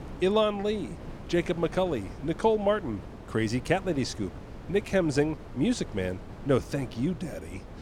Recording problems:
wind noise on the microphone; occasional gusts; 20 dB below the speech

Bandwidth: 17 kHz